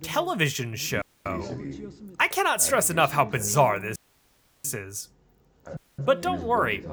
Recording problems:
background chatter; noticeable; throughout; 2 voices, 15 dB below the speech
audio cutting out; at 1 s, at 4 s for 0.5 s and at 6 s

